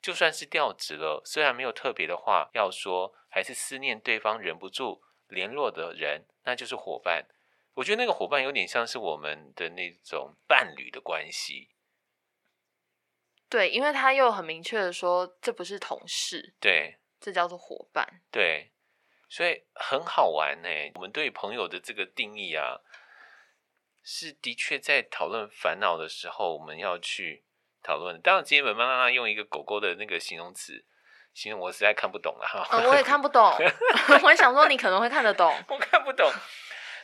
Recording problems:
thin; very; fading below 650 Hz

